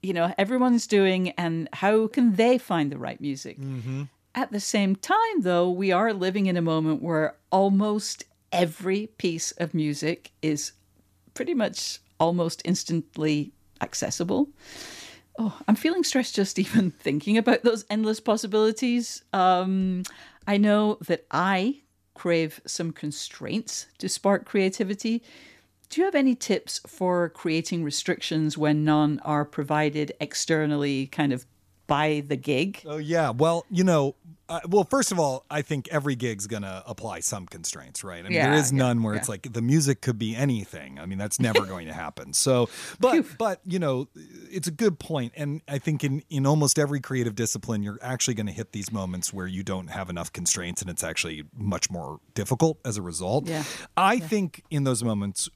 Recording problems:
none

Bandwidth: 14.5 kHz